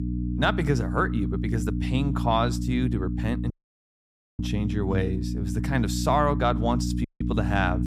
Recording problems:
electrical hum; loud; throughout; 60 Hz, 10 dB below the speech
audio cutting out; at 3.5 s for 1 s and at 7 s

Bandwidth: 14.5 kHz